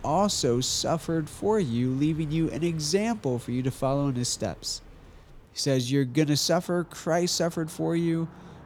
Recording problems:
traffic noise; faint; throughout; 25 dB below the speech

